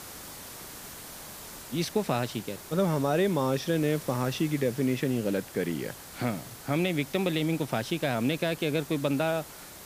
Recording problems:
hiss; noticeable; throughout; 15 dB below the speech

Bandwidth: 15 kHz